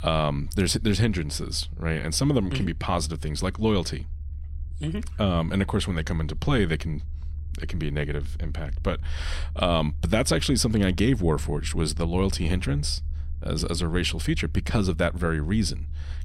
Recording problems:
low rumble; faint; throughout; 25 dB below the speech

